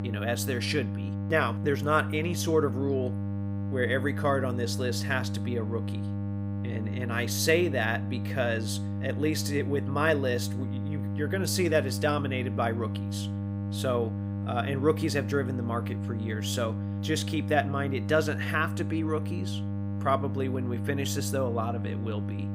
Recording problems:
electrical hum; noticeable; throughout; 50 Hz, 10 dB below the speech

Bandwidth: 15.5 kHz